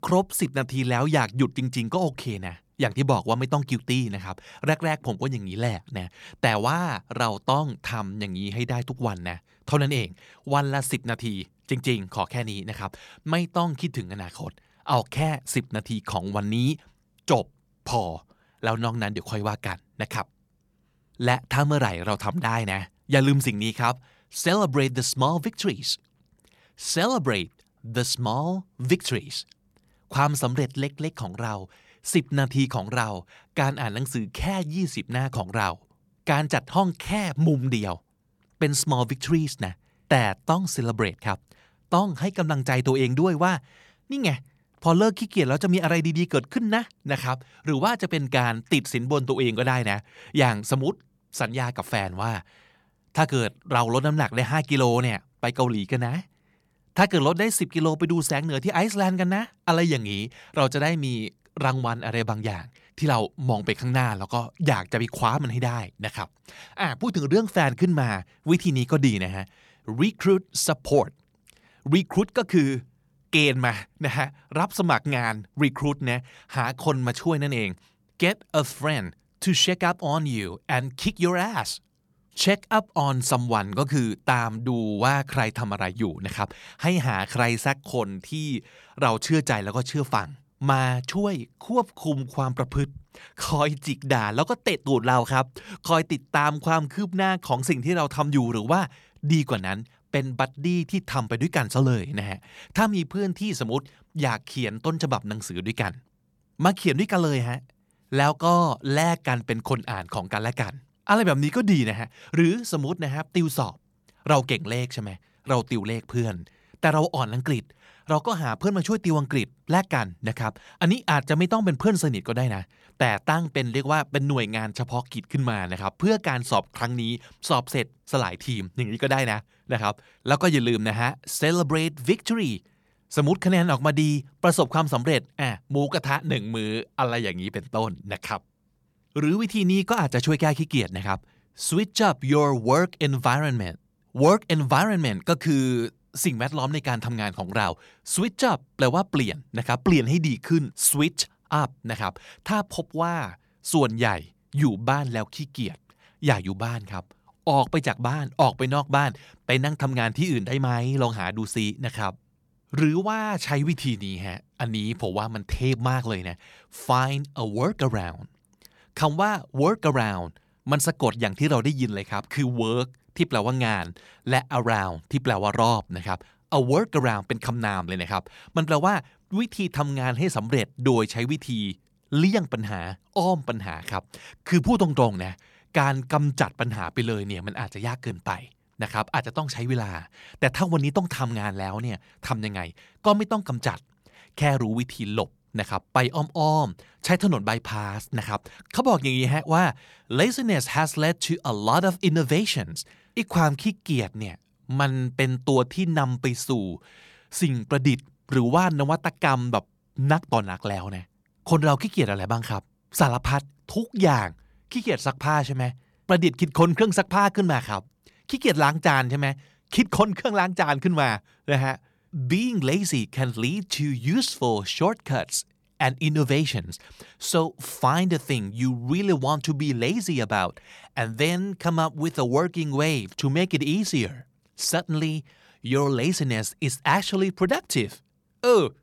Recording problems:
none

